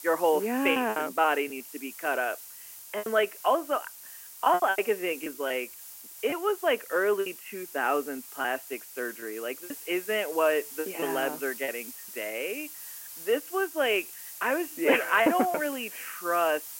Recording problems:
phone-call audio
hiss; noticeable; throughout; 10 dB below the speech
choppy; very; 7% of the speech affected

